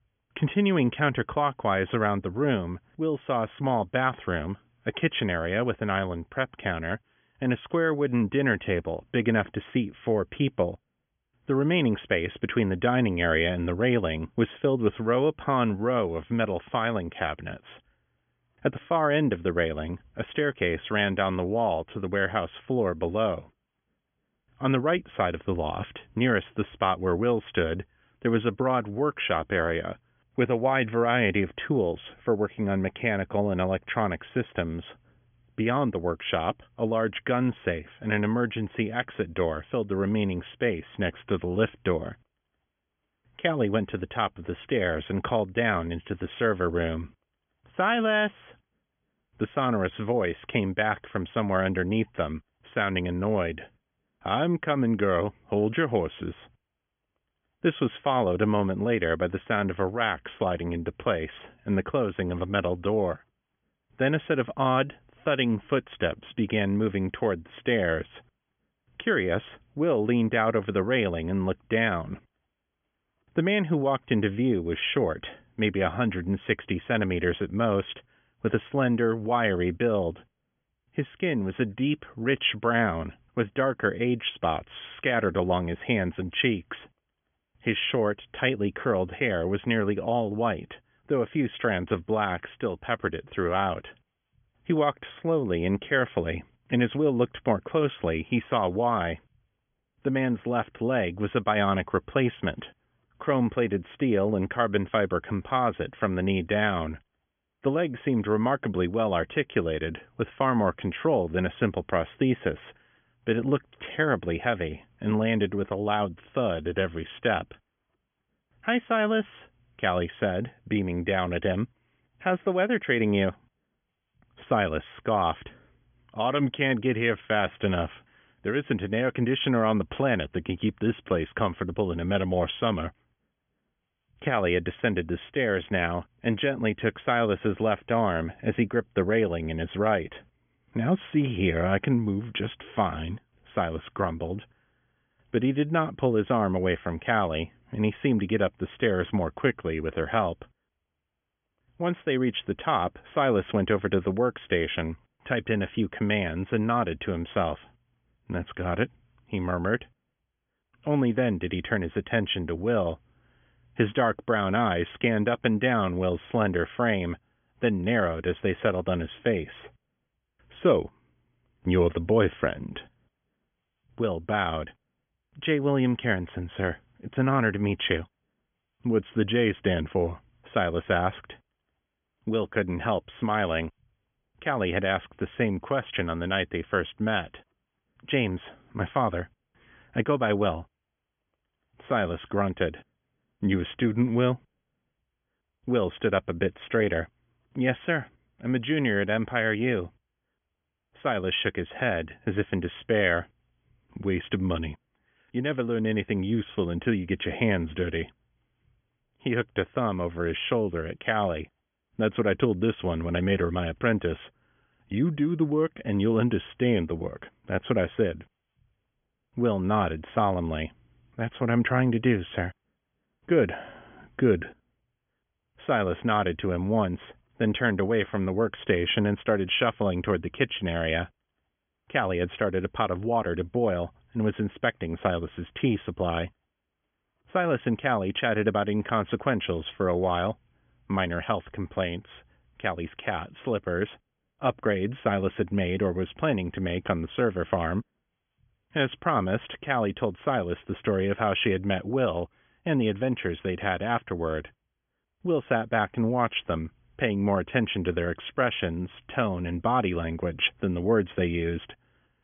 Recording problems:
high frequencies cut off; severe; nothing above 3.5 kHz

